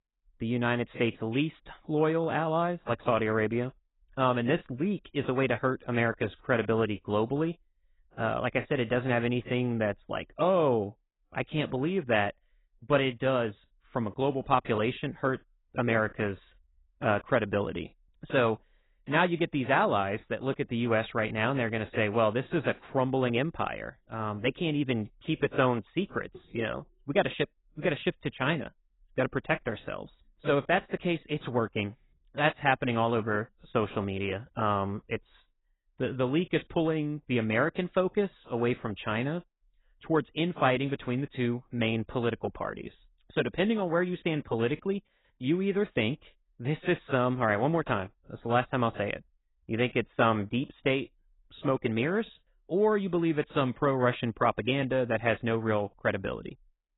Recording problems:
garbled, watery; badly; nothing above 4 kHz

